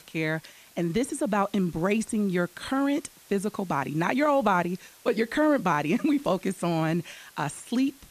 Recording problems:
hiss; faint; throughout; 25 dB below the speech

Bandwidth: 14.5 kHz